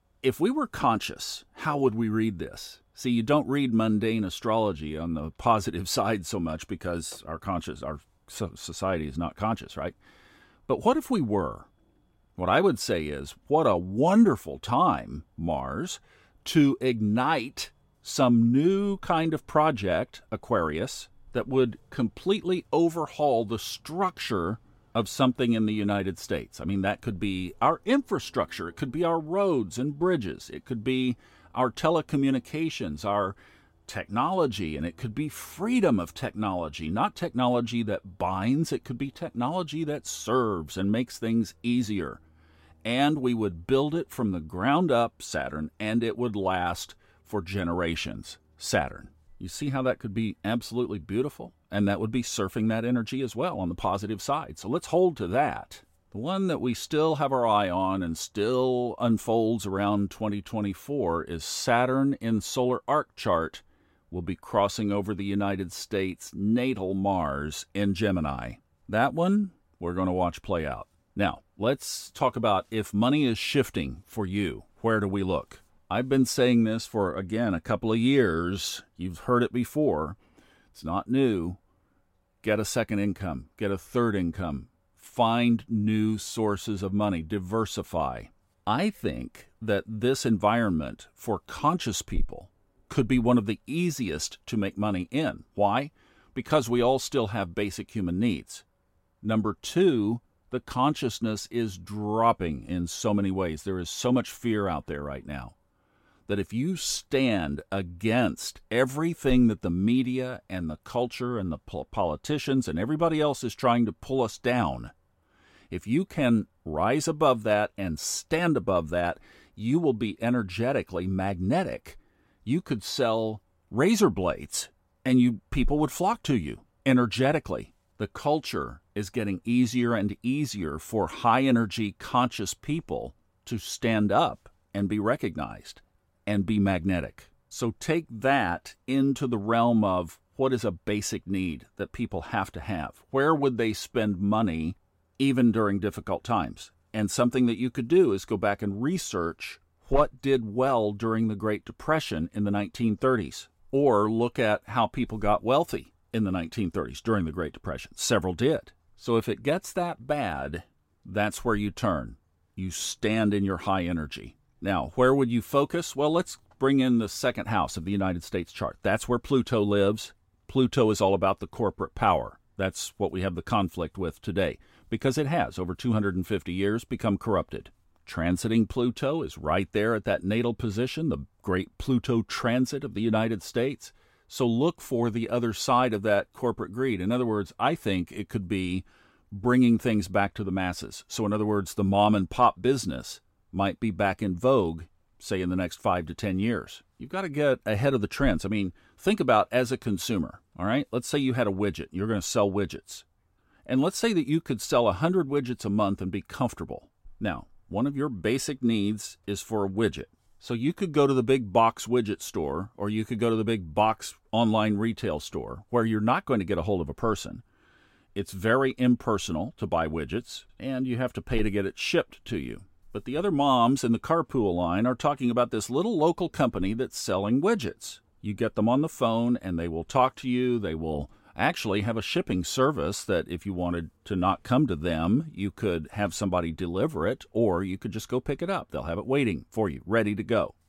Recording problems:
none

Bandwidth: 16 kHz